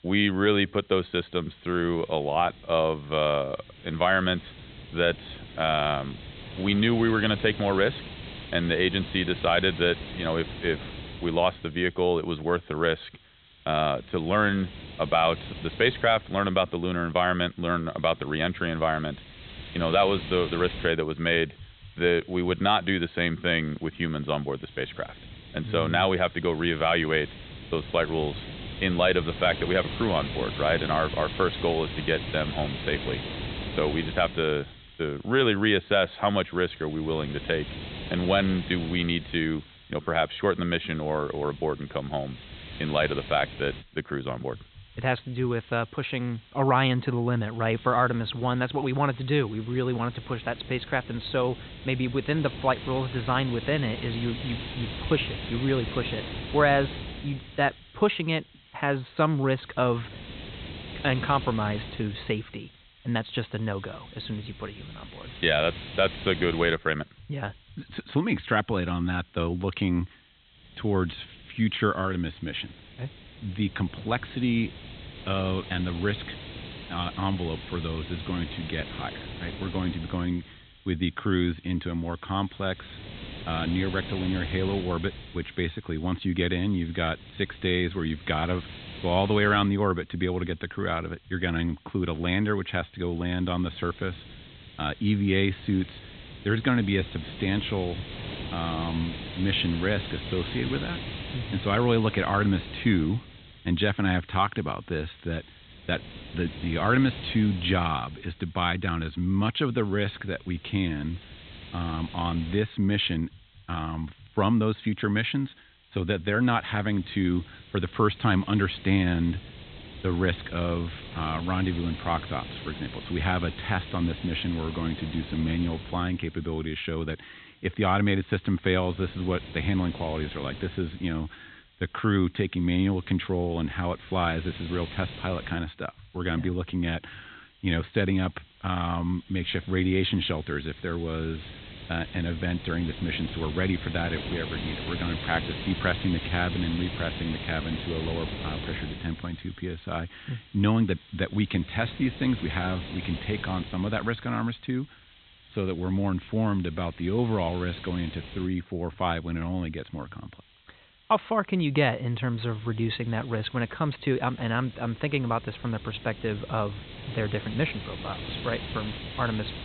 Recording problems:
high frequencies cut off; severe; nothing above 4 kHz
hiss; noticeable; throughout; 10 dB below the speech

